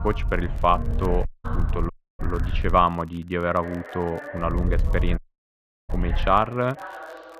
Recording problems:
muffled; very; fading above 3.5 kHz
voice in the background; noticeable; throughout; 15 dB below the speech
wind noise on the microphone; occasional gusts; until 3 s and from 4.5 to 6.5 s; 20 dB below the speech
crackle, like an old record; faint; 30 dB below the speech
audio cutting out; at 1.5 s, at 2 s and at 5 s for 0.5 s

